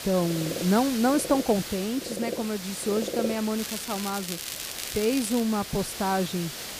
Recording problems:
animal sounds; loud; throughout; 10 dB below the speech
hiss; loud; throughout; 8 dB below the speech
crackling; loud; from 3.5 to 5.5 s; 8 dB below the speech

